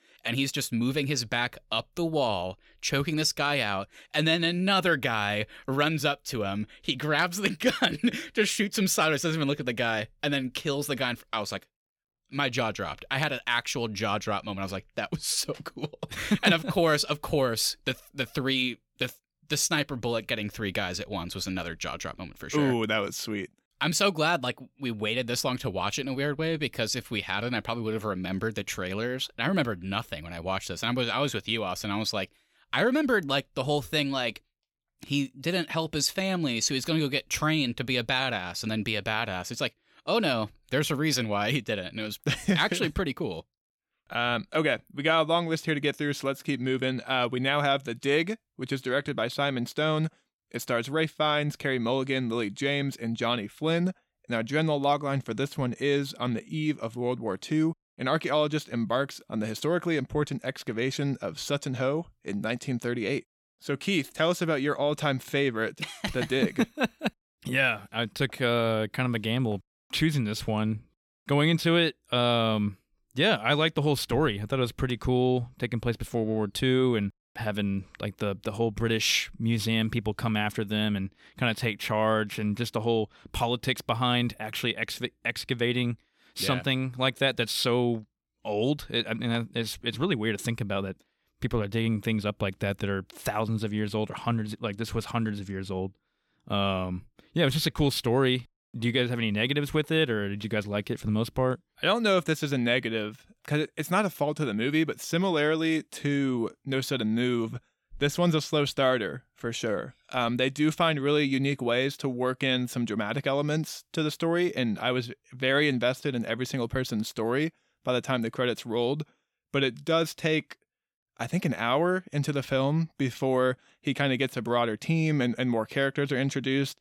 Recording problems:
none

